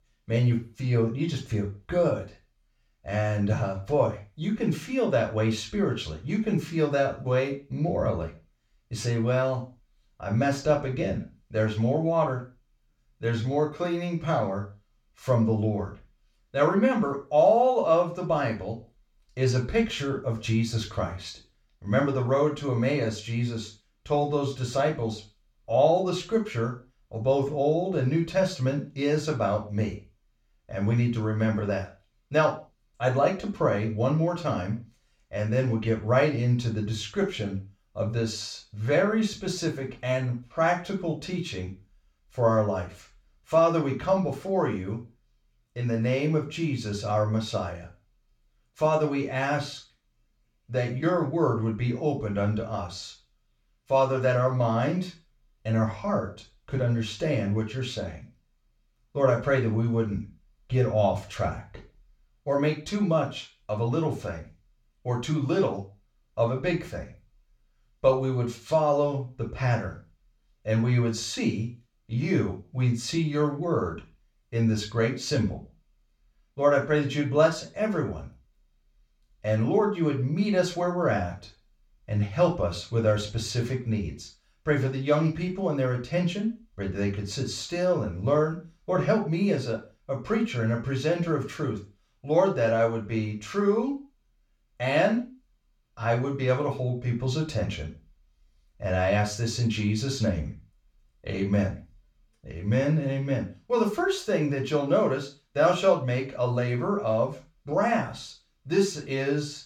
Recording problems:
room echo; slight; dies away in 0.3 s
off-mic speech; somewhat distant

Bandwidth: 17 kHz